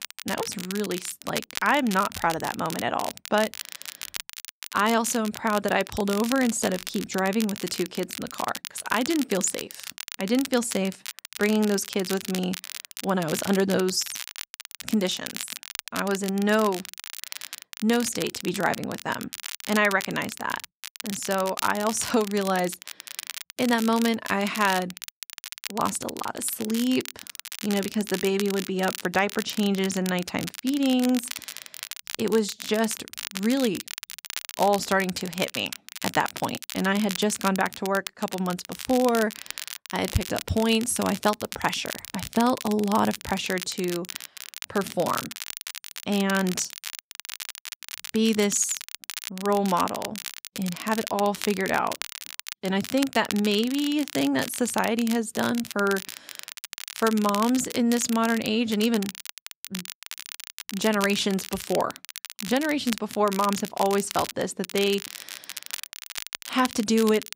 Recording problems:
crackle, like an old record; loud; 10 dB below the speech

